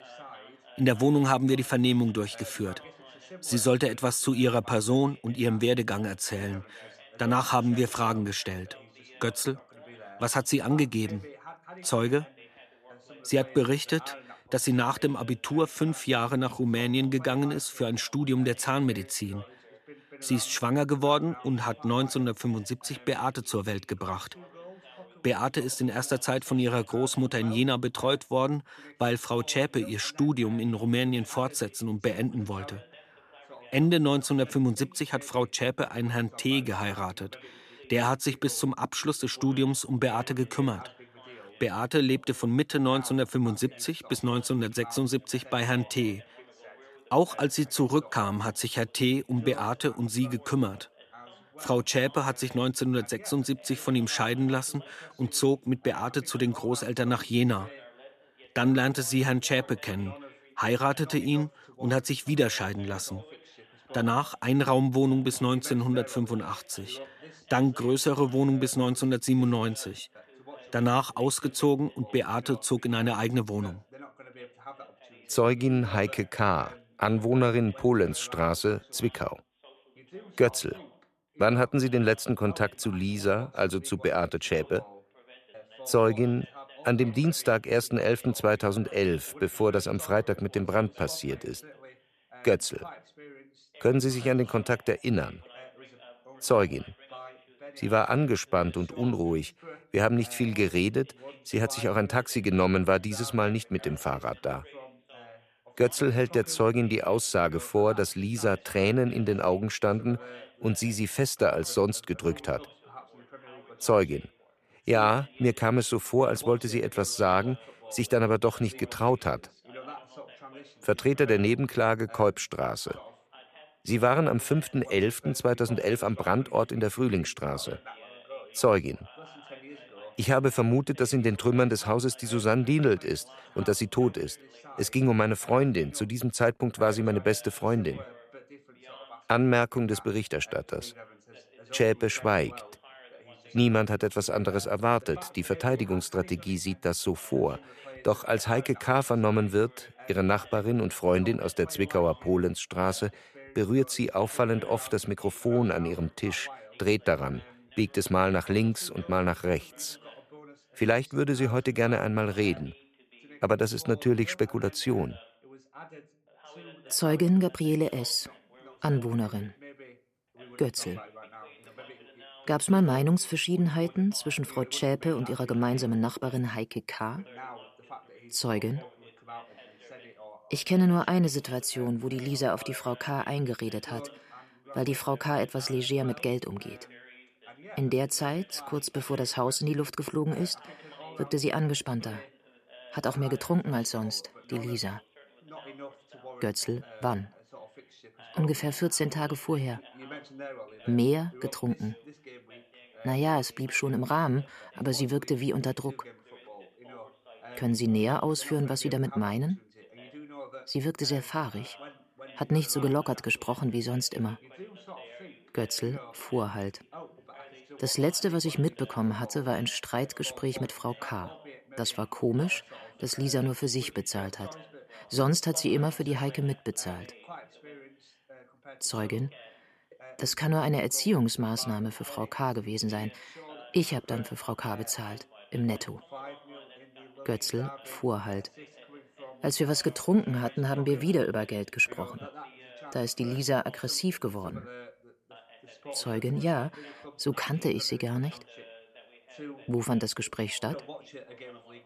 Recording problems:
background chatter; faint; throughout; 2 voices, 20 dB below the speech

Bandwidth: 14.5 kHz